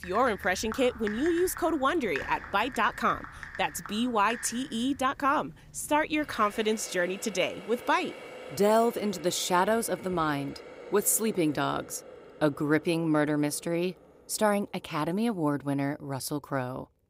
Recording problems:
household noises; noticeable; throughout; 15 dB below the speech

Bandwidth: 15.5 kHz